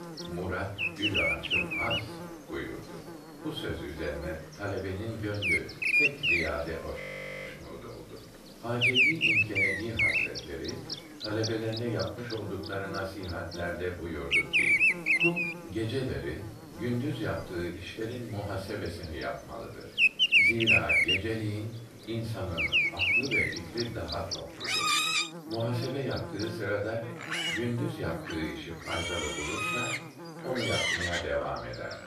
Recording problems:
off-mic speech; far
room echo; noticeable; dies away in 0.4 s
animal sounds; very loud; throughout; 10 dB above the speech
electrical hum; loud; throughout; 60 Hz, 8 dB below the speech
voice in the background; faint; throughout; 30 dB below the speech
audio freezing; at 7 s

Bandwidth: 14.5 kHz